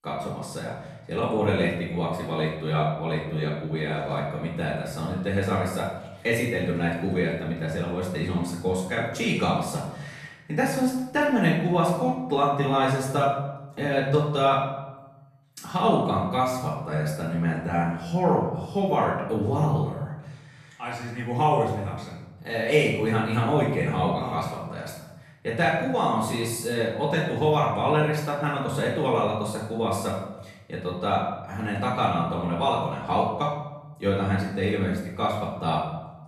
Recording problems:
off-mic speech; far
room echo; noticeable; dies away in 0.9 s

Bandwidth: 13.5 kHz